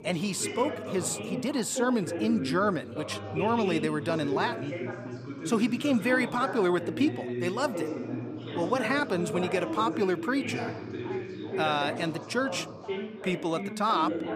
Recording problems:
background chatter; loud; throughout; 3 voices, 6 dB below the speech

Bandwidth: 15 kHz